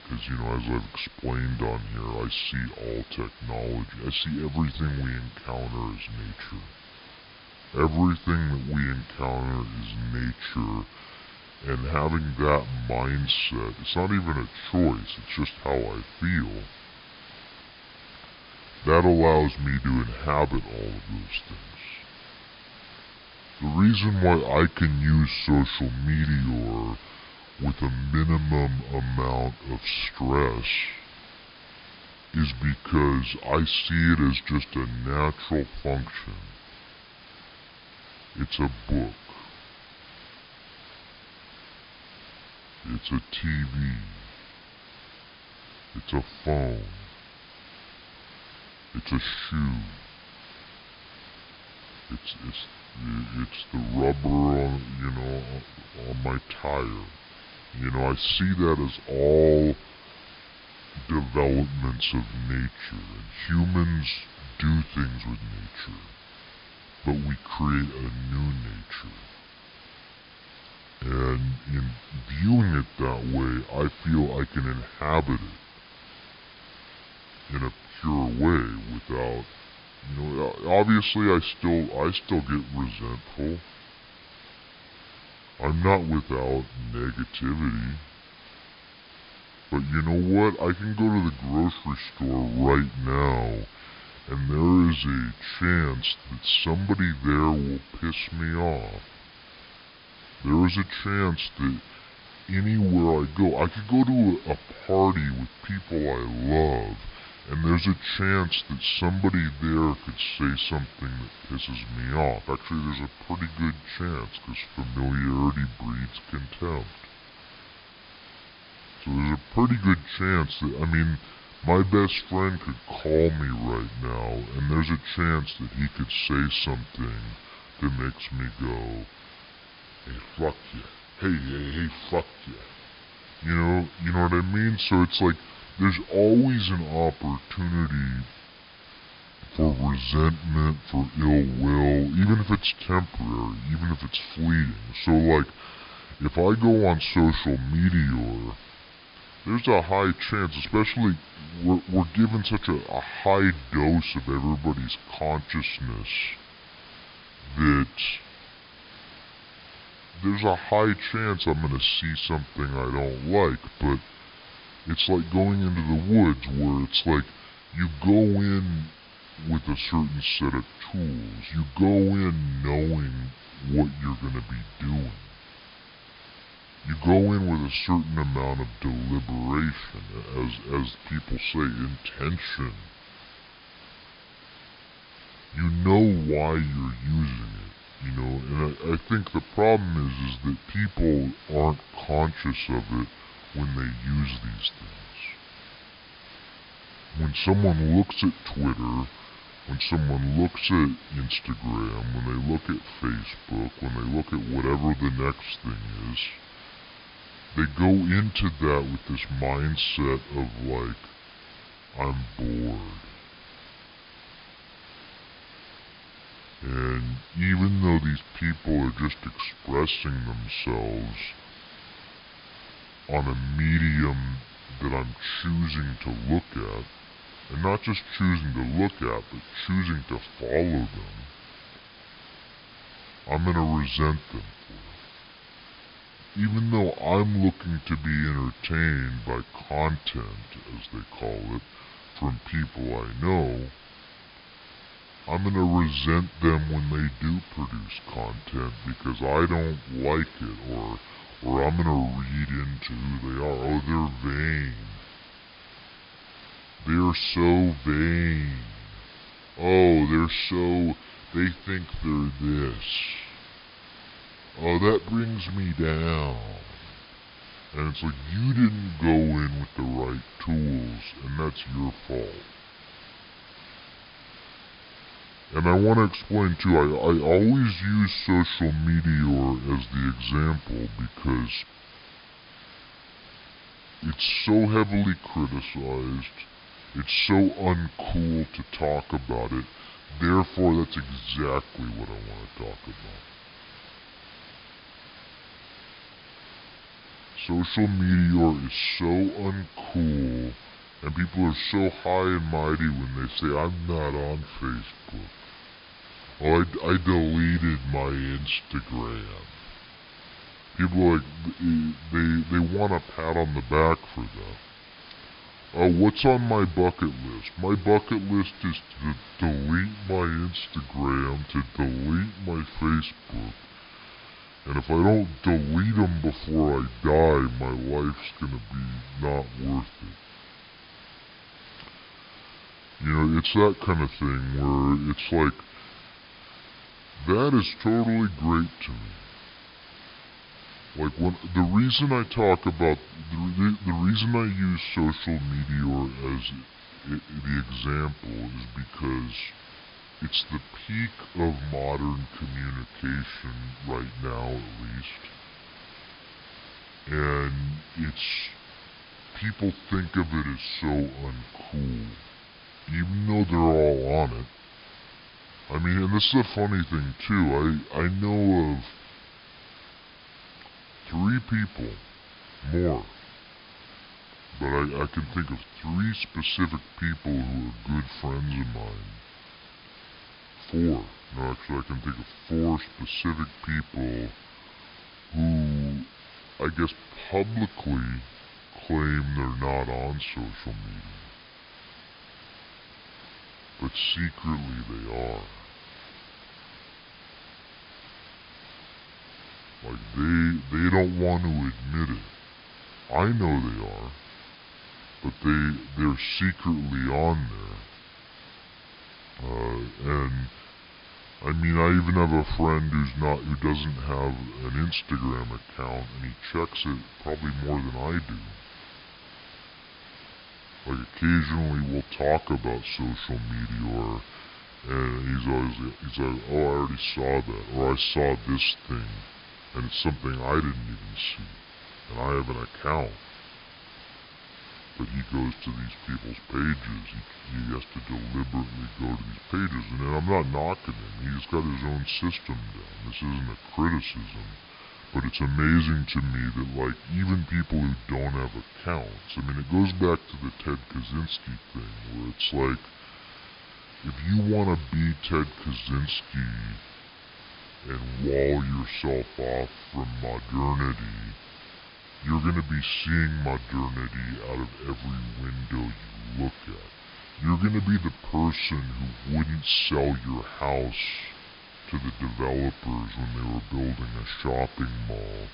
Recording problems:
wrong speed and pitch; too slow and too low; 0.7 times normal speed
high frequencies cut off; noticeable; nothing above 5 kHz
hiss; noticeable; throughout; 20 dB below the speech

